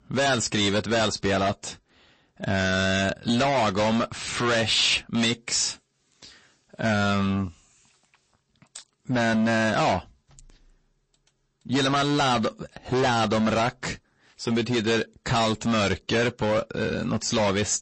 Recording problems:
distortion; heavy; 17% of the sound clipped
garbled, watery; slightly; nothing above 8 kHz

